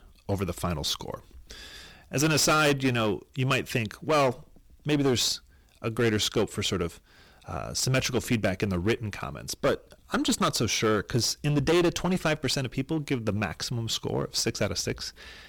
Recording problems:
distortion; heavy; 9% of the sound clipped

